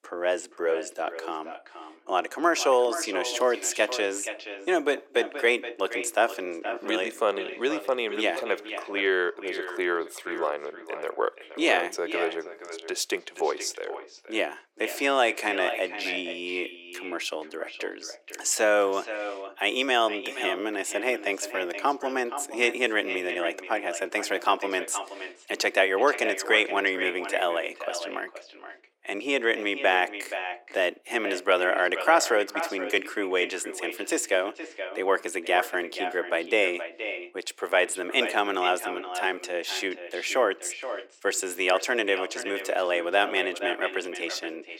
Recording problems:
echo of what is said; strong; throughout; 470 ms later, 10 dB below the speech
thin; very; fading below 400 Hz

